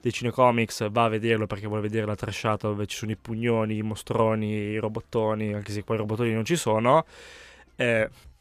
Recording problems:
none

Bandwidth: 14.5 kHz